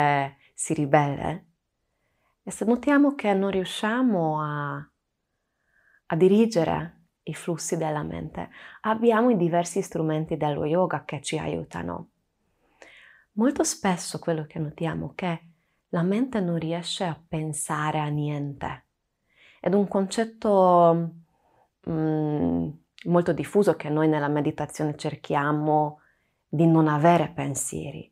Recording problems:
abrupt cut into speech; at the start

